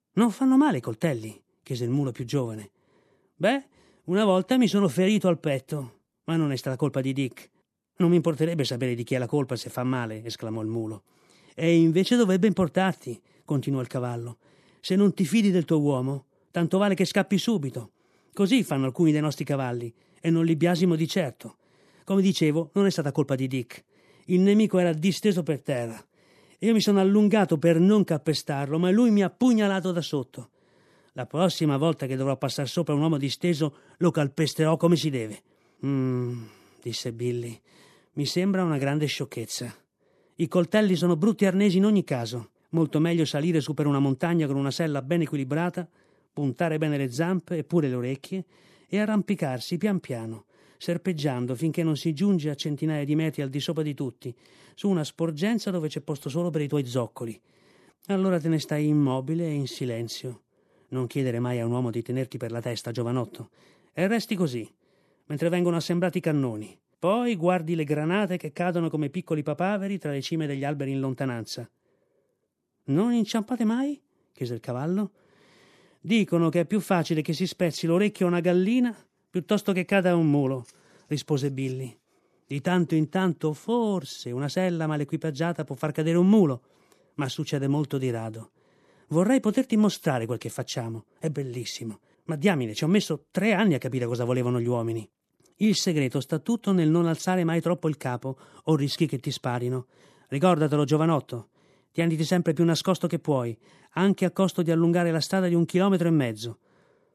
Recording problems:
none

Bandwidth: 13.5 kHz